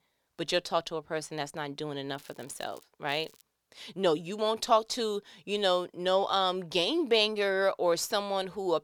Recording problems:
crackling; faint; at 2 s and at 3 s; 30 dB below the speech

